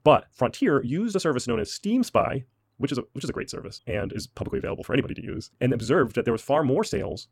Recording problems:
wrong speed, natural pitch; too fast; 1.7 times normal speed

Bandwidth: 16.5 kHz